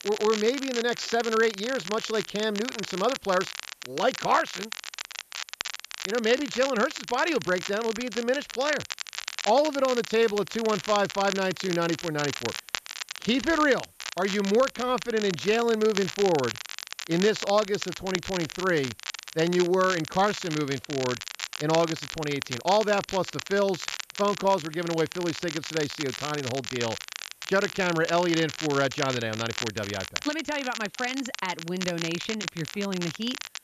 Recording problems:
high frequencies cut off; noticeable; nothing above 7.5 kHz
crackle, like an old record; loud; 8 dB below the speech
hiss; faint; throughout; 30 dB below the speech

